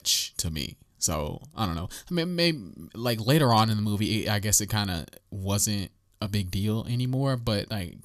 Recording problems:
none

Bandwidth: 14 kHz